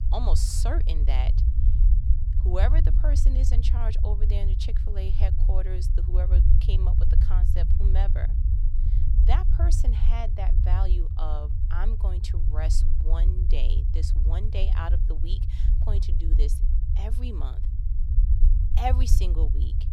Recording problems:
low rumble; loud; throughout; 6 dB below the speech

